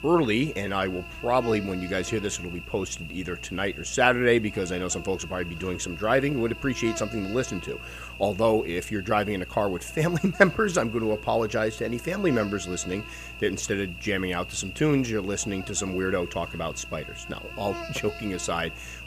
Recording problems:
electrical hum; noticeable; throughout; 60 Hz, 10 dB below the speech

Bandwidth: 15 kHz